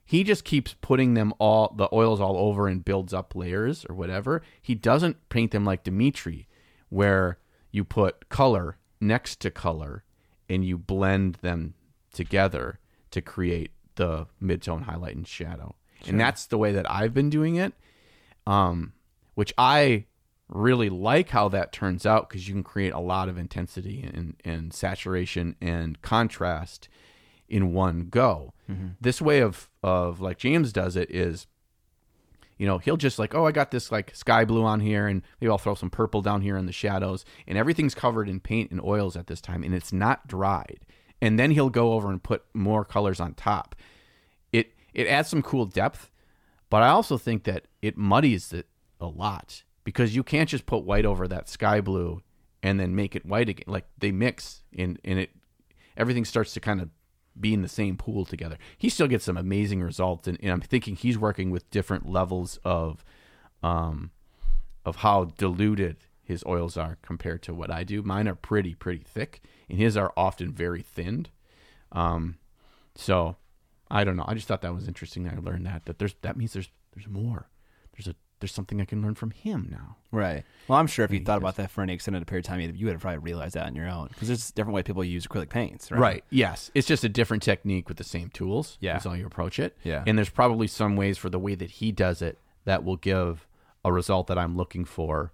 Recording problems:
none

